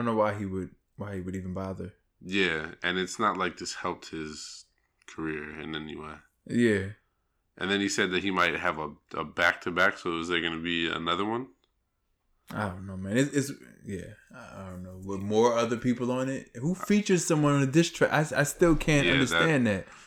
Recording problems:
abrupt cut into speech; at the start

